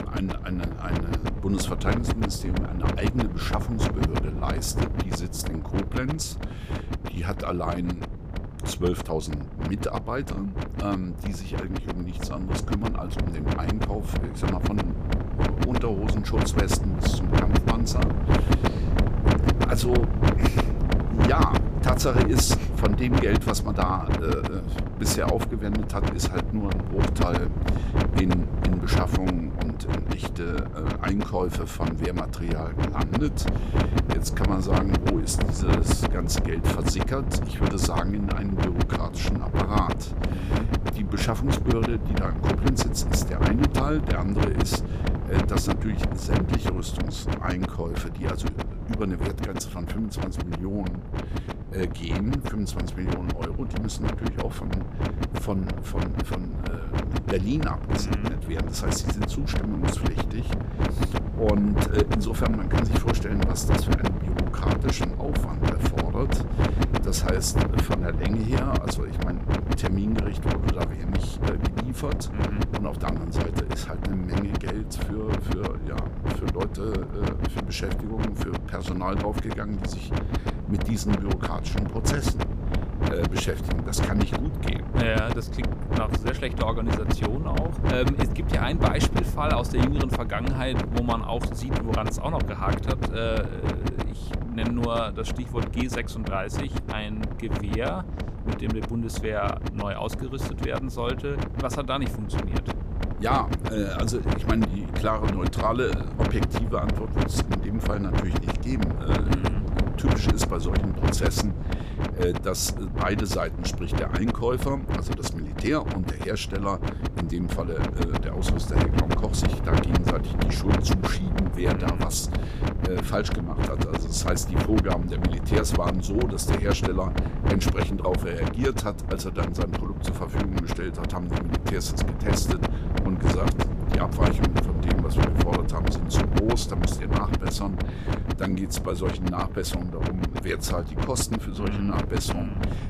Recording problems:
wind noise on the microphone; heavy; 1 dB below the speech

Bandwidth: 14.5 kHz